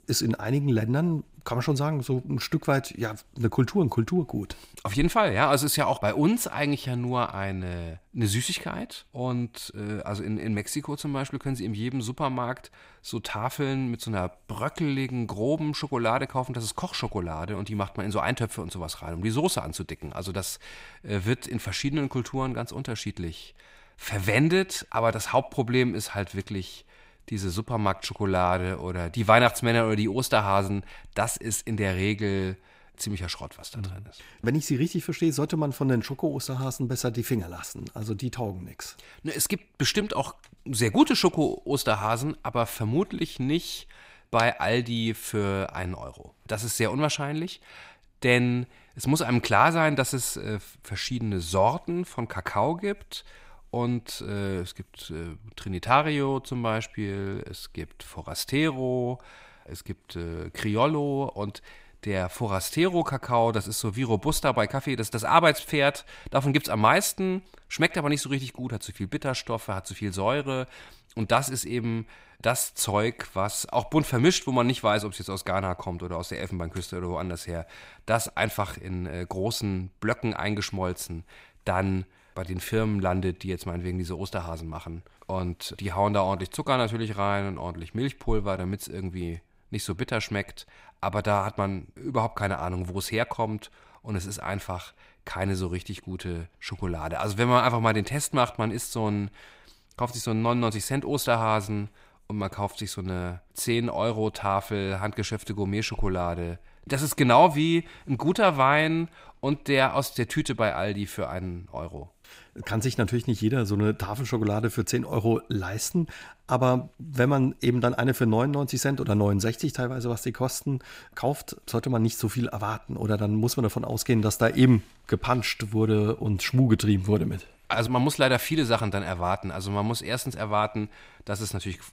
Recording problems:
echo of what is said; faint; throughout; 80 ms later, 25 dB below the speech

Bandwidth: 15.5 kHz